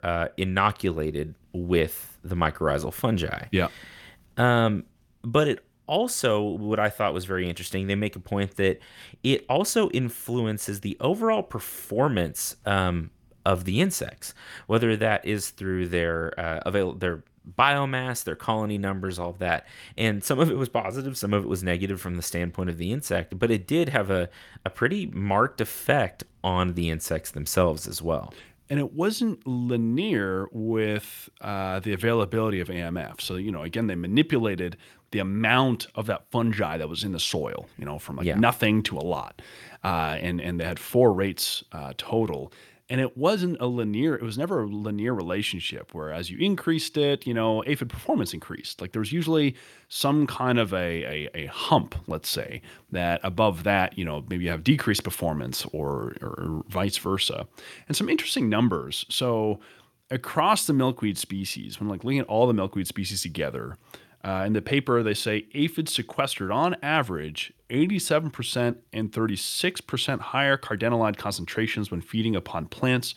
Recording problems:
none

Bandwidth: 18 kHz